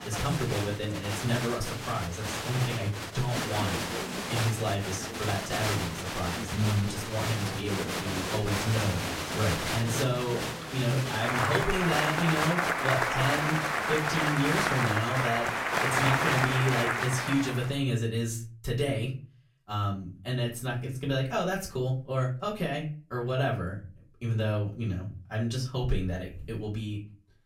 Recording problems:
off-mic speech; far
room echo; very slight; dies away in 0.4 s
crowd noise; very loud; until 17 s; 1 dB above the speech

